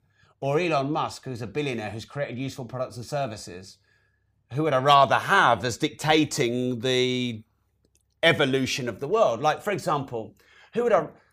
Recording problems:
none

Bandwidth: 15 kHz